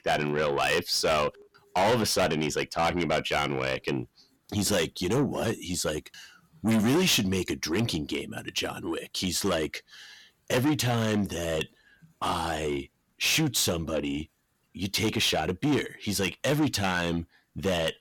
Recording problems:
distortion; heavy; 6 dB below the speech

